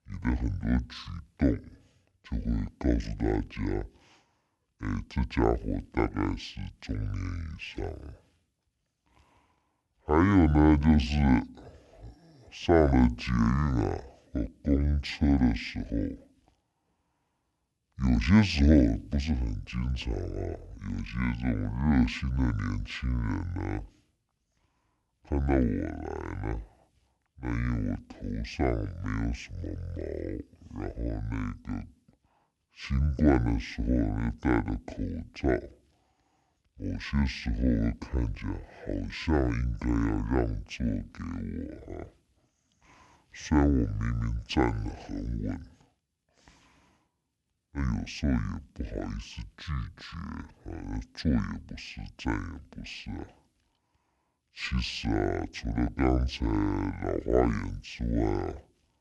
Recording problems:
wrong speed and pitch; too slow and too low; 0.6 times normal speed

